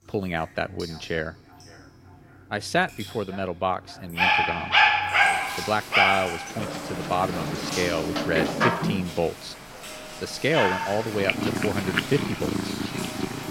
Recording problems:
echo of what is said; faint; throughout; 550 ms later, 20 dB below the speech
animal sounds; very loud; from 4 s on; 4 dB above the speech
rain or running water; loud; throughout; 9 dB below the speech

